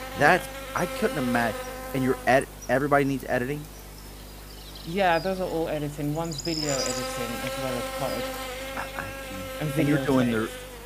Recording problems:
electrical hum; loud; throughout; 50 Hz, 7 dB below the speech

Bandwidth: 15 kHz